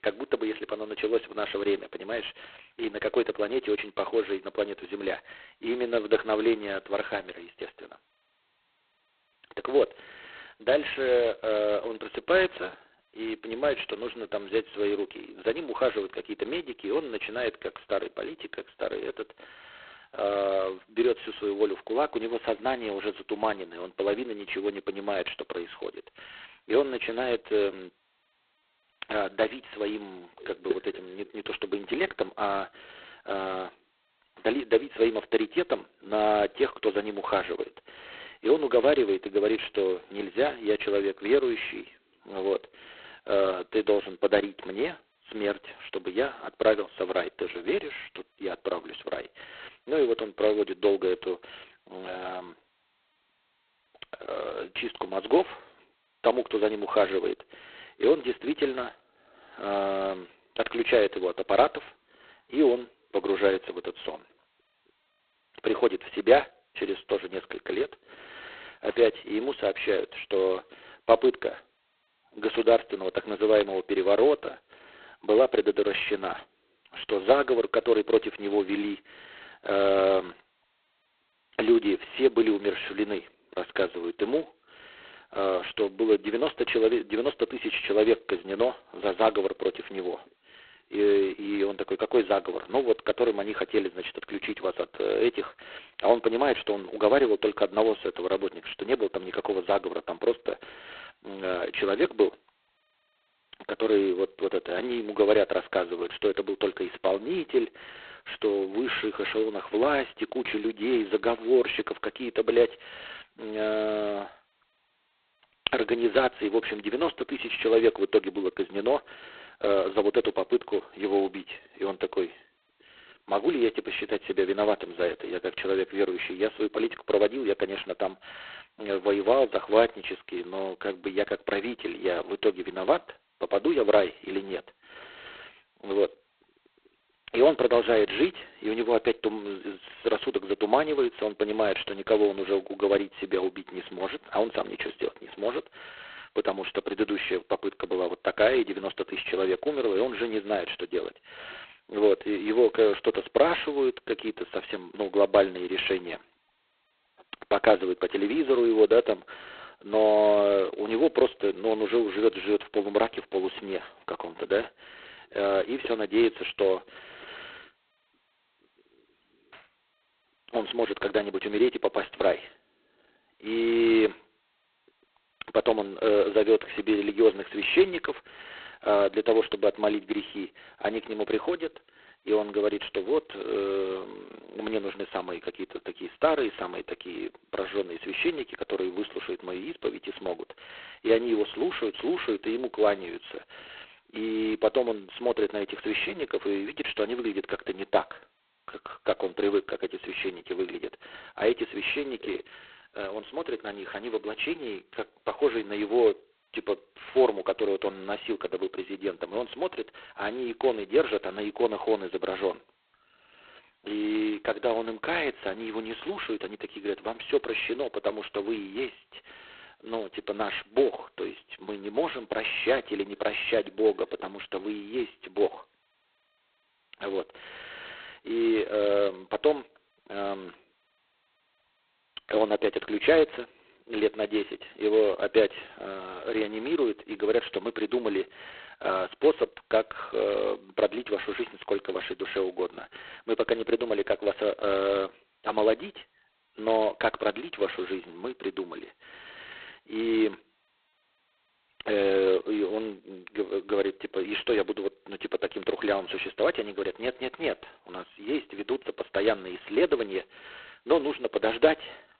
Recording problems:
phone-call audio; poor line; nothing above 4 kHz

